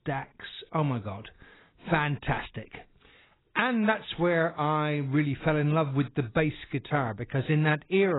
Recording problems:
garbled, watery; badly; nothing above 4 kHz
abrupt cut into speech; at the end

